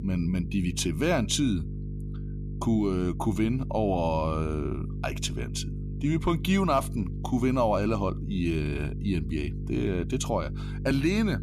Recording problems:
electrical hum; noticeable; throughout; 50 Hz, 15 dB below the speech

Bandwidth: 14.5 kHz